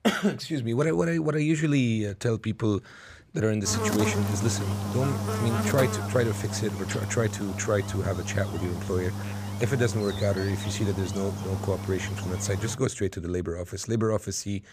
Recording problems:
electrical hum; loud; from 3.5 to 13 s; 50 Hz, 5 dB below the speech

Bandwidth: 15 kHz